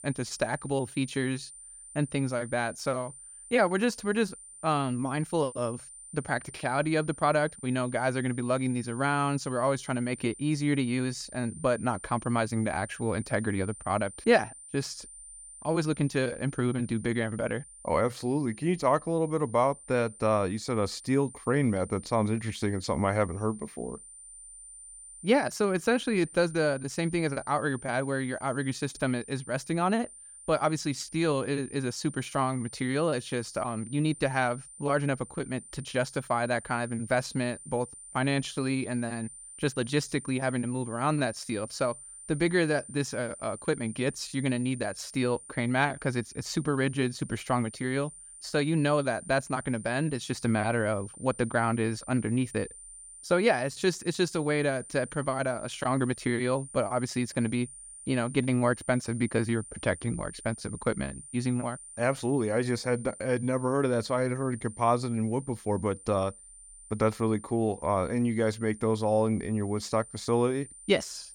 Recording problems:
high-pitched whine; noticeable; throughout; 9 kHz, 15 dB below the speech

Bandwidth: 17.5 kHz